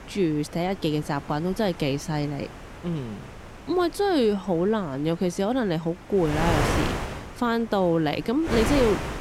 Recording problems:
wind noise on the microphone; heavy; 6 dB below the speech

